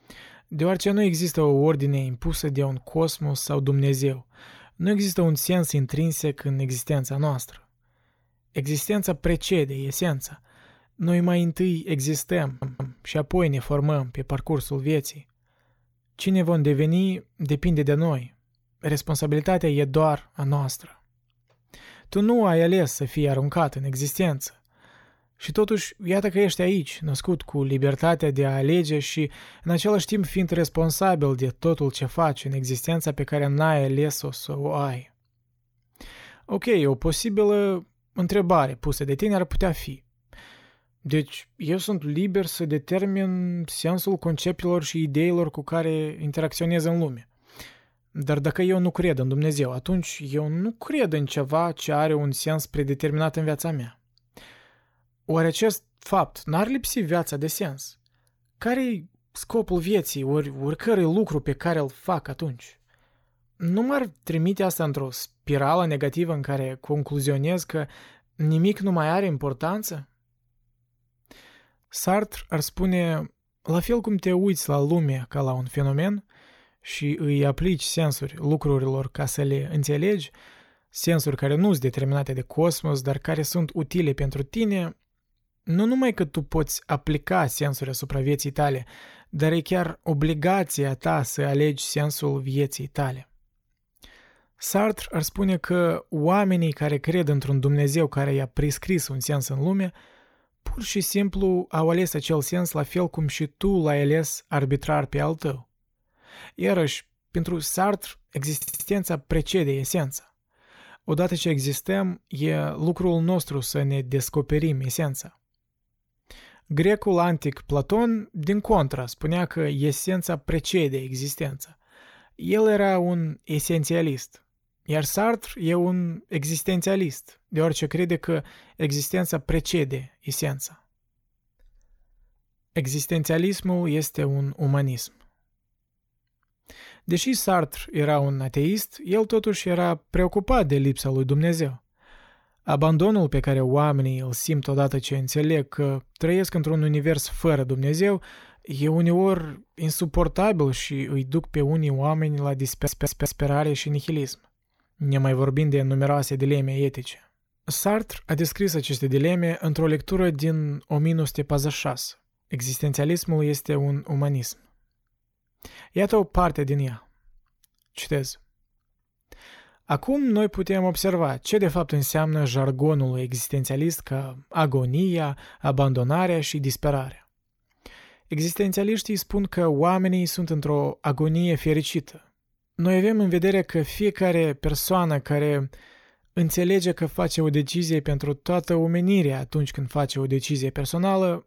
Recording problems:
audio stuttering; at 12 s, at 1:49 and at 2:33

